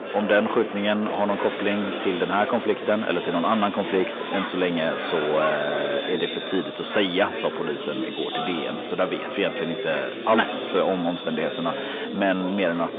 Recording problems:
echo of what is said; noticeable; throughout; 360 ms later, 15 dB below the speech
phone-call audio
distortion; slight; 15 dB below the speech
chatter from many people; loud; throughout; 6 dB below the speech

